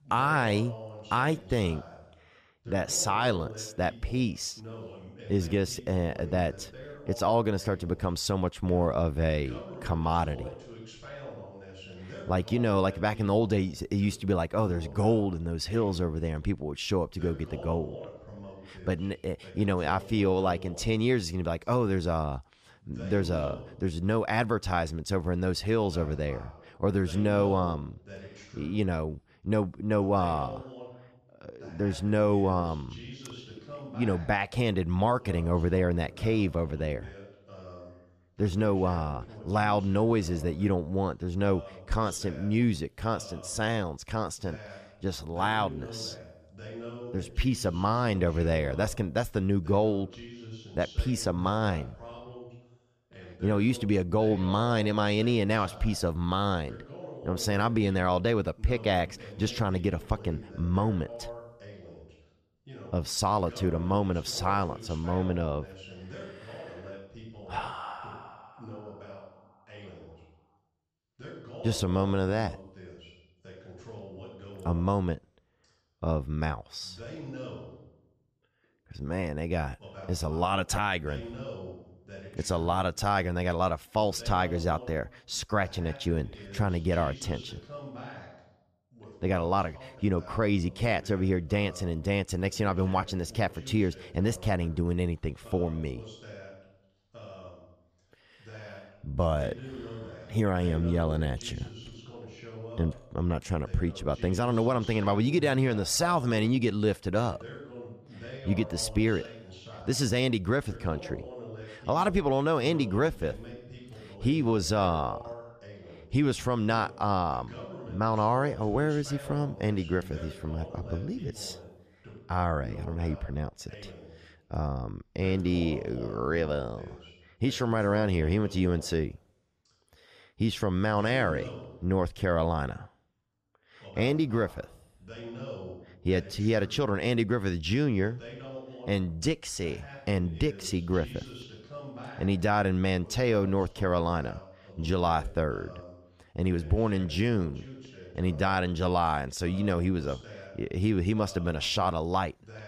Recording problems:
voice in the background; noticeable; throughout; 15 dB below the speech

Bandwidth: 14.5 kHz